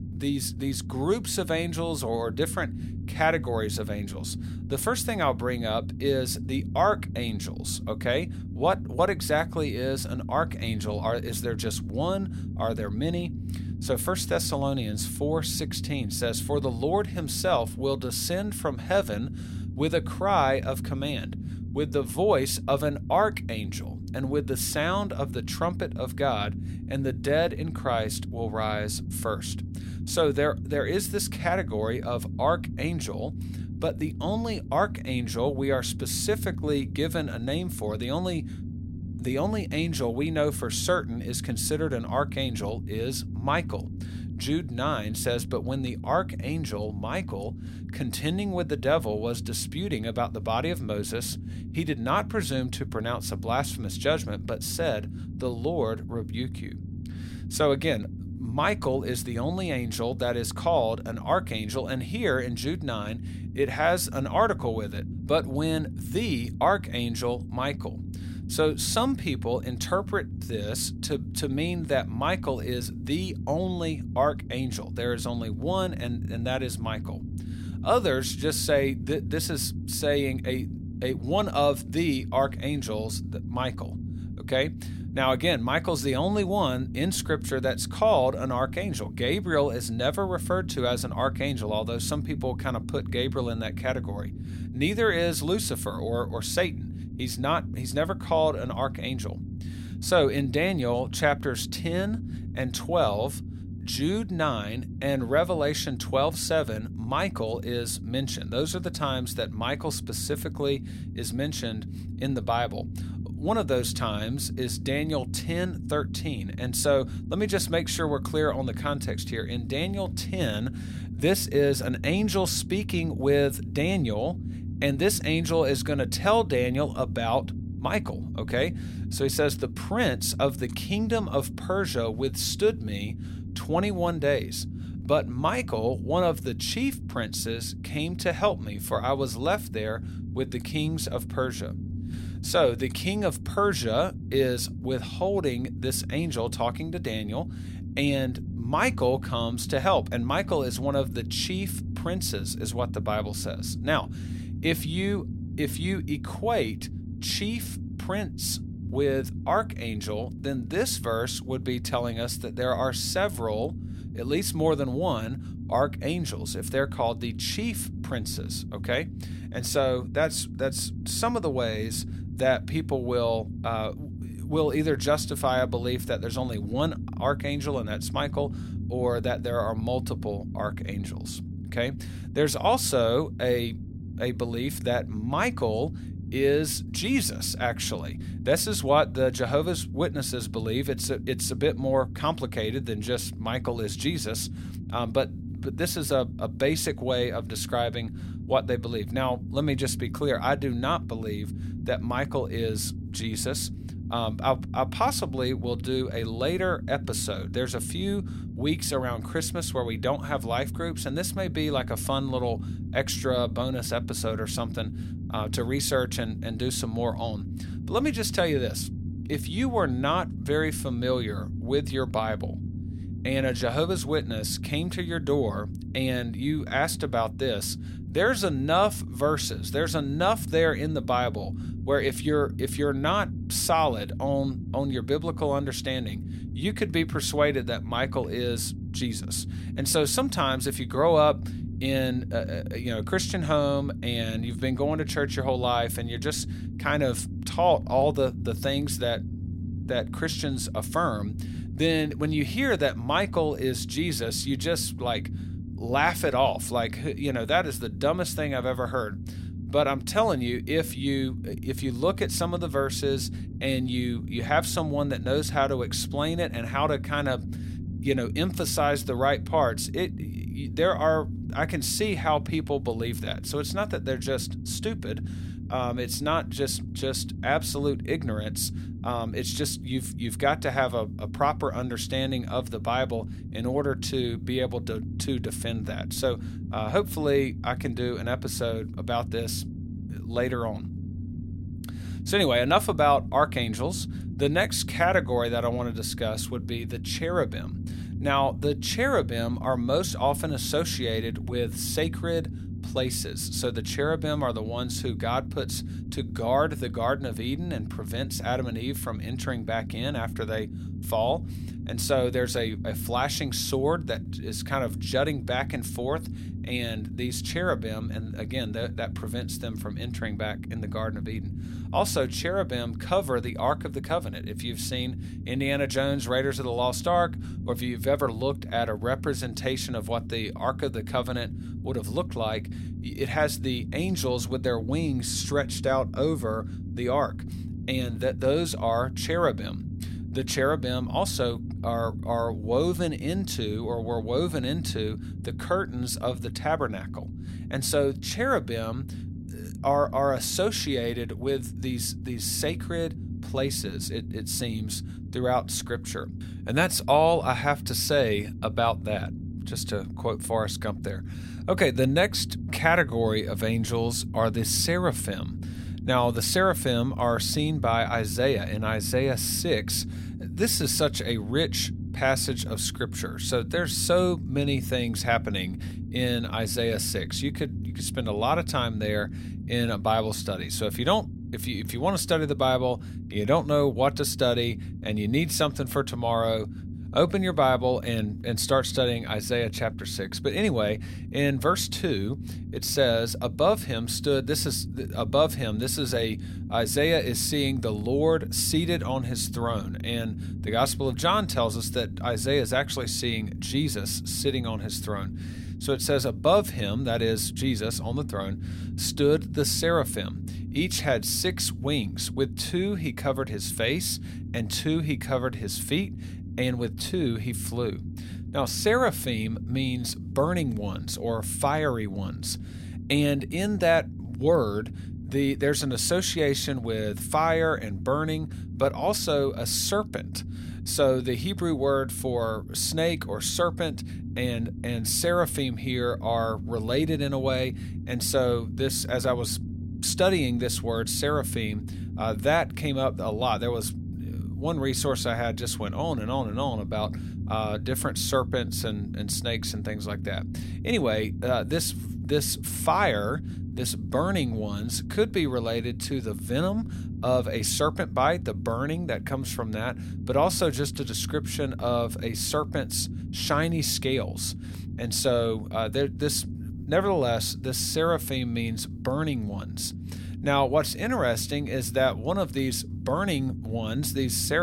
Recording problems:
low rumble; noticeable; throughout; 15 dB below the speech
abrupt cut into speech; at the end

